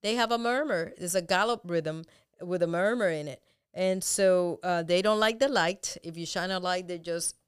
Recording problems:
none

